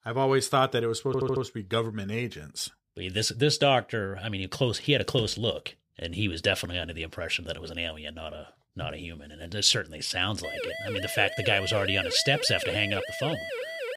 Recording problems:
audio stuttering; at 1 s
siren; noticeable; from 10 s on; peak 6 dB below the speech

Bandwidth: 15 kHz